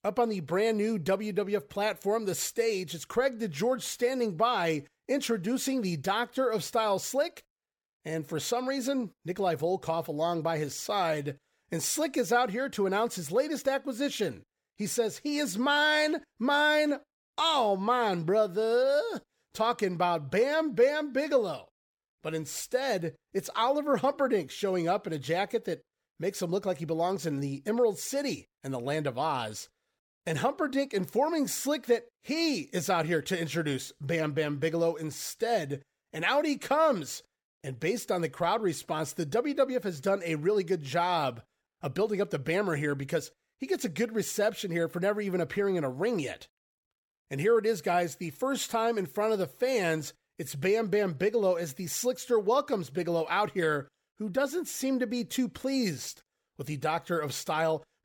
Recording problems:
none

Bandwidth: 17 kHz